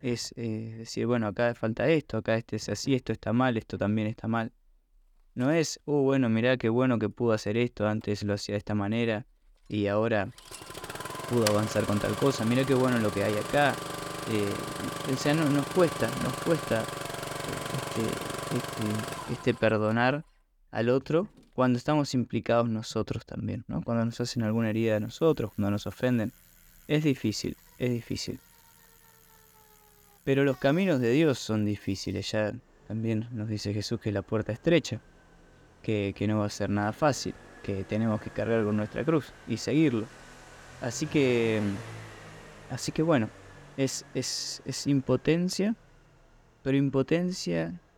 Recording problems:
traffic noise; loud; throughout; 9 dB below the speech

